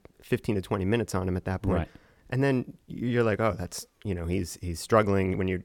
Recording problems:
none

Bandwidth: 17.5 kHz